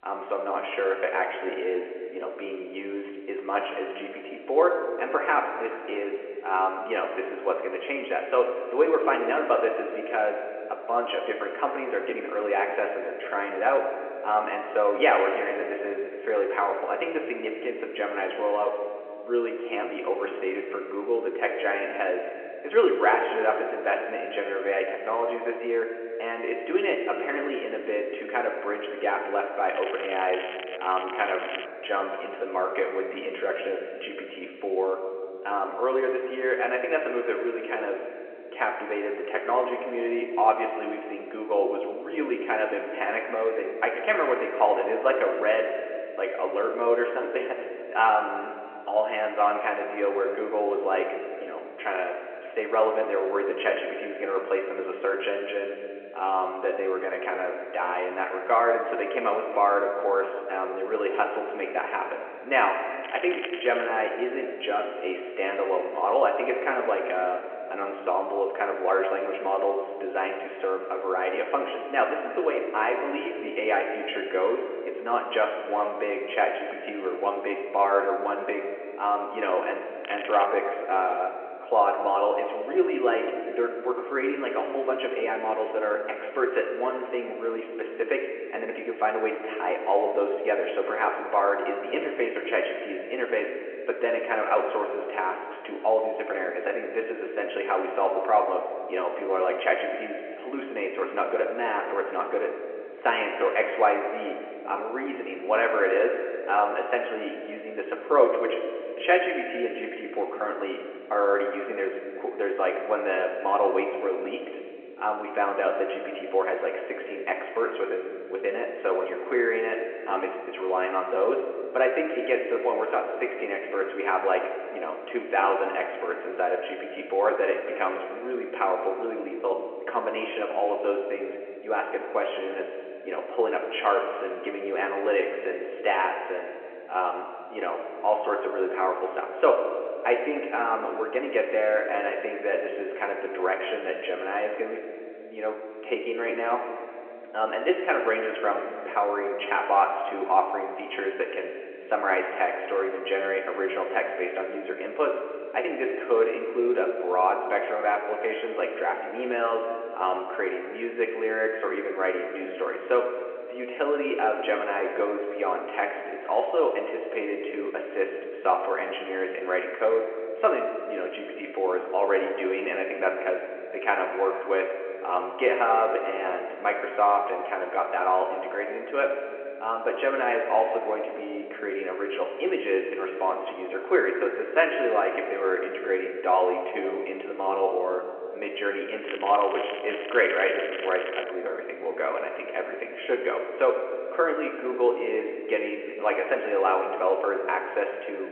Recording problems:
room echo; slight; dies away in 2.2 s
phone-call audio
off-mic speech; somewhat distant
crackling; noticeable; 4 times, first at 30 s; 10 dB below the speech

